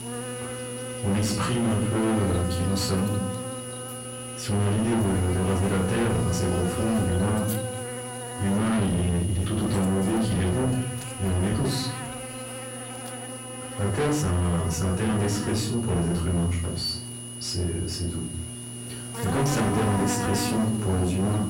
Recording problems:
distortion; heavy; 6 dB below the speech
off-mic speech; far
room echo; slight; dies away in 0.6 s
electrical hum; loud; throughout; 60 Hz, 6 dB below the speech
high-pitched whine; noticeable; throughout; 10 kHz, 10 dB below the speech

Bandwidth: 16 kHz